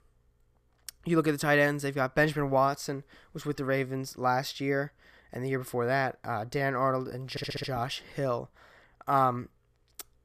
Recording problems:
audio stuttering; at 7.5 s

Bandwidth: 14.5 kHz